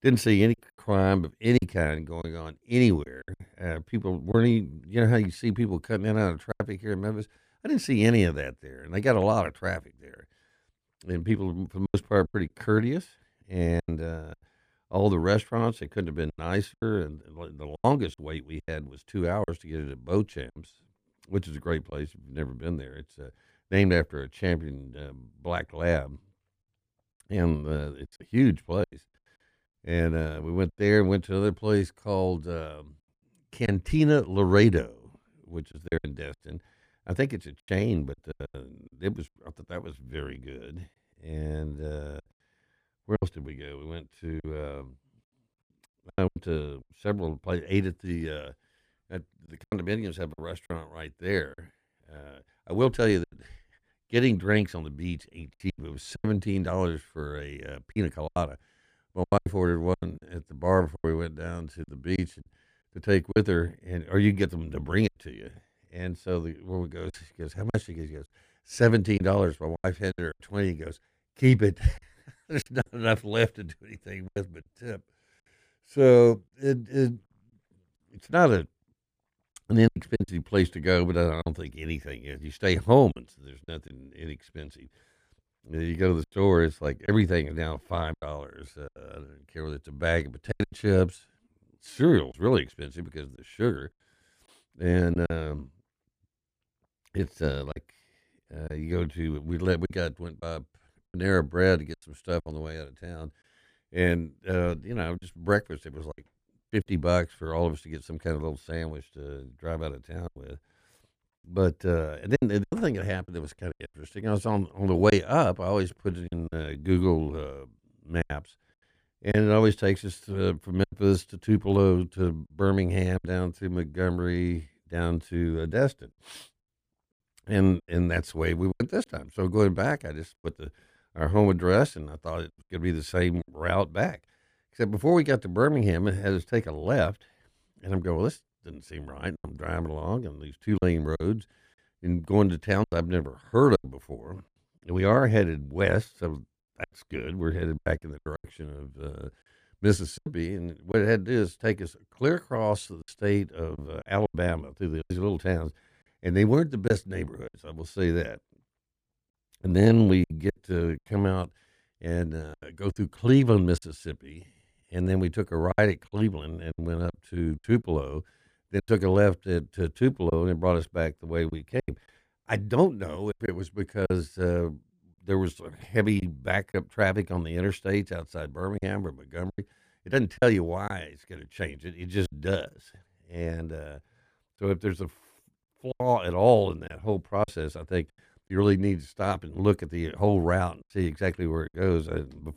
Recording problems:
choppy; very; 6% of the speech affected

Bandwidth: 15 kHz